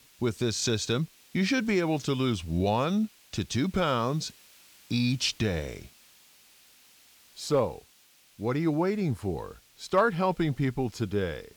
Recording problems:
hiss; faint; throughout; 25 dB below the speech

